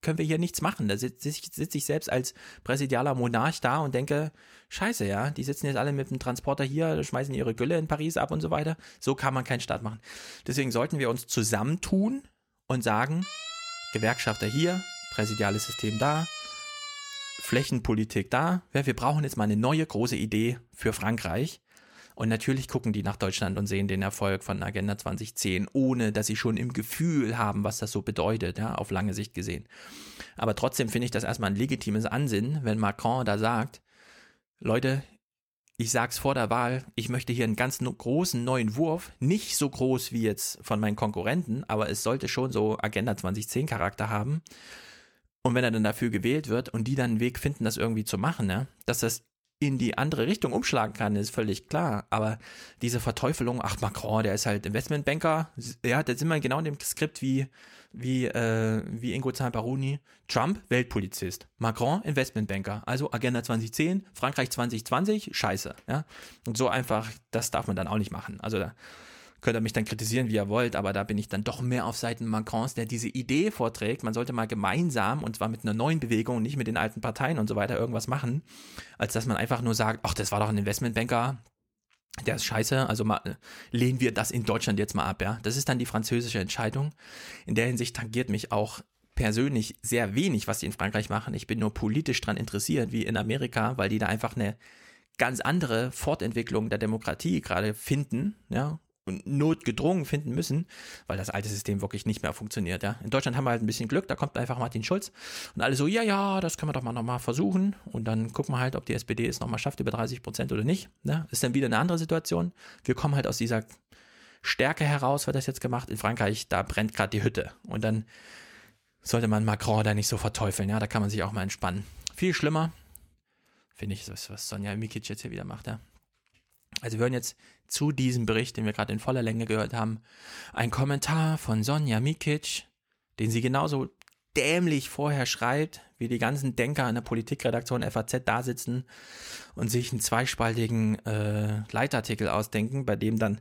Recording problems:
siren; noticeable; from 13 to 18 s; peak 7 dB below the speech
uneven, jittery; strongly; from 51 s to 2:20

